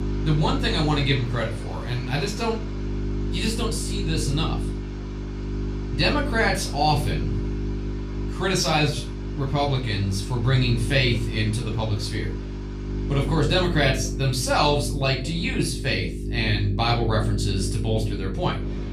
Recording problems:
off-mic speech; far
room echo; slight; dies away in 0.3 s
electrical hum; noticeable; throughout; 50 Hz, 15 dB below the speech
rain or running water; faint; throughout; 20 dB below the speech

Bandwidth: 14 kHz